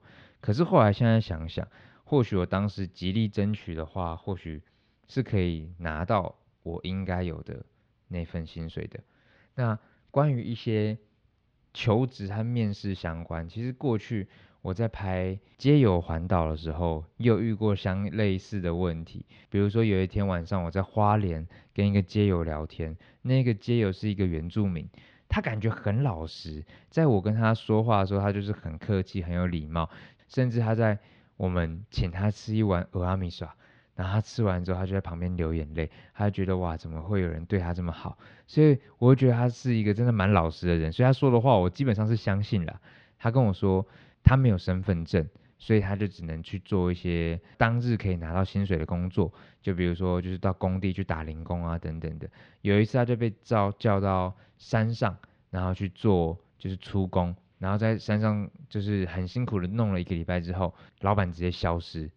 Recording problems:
muffled; slightly; fading above 4 kHz

